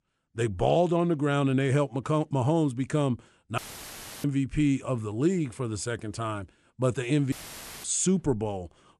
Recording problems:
audio cutting out; filled with static; at 3.5 s for 0.5 s and at 7.5 s for 0.5 s

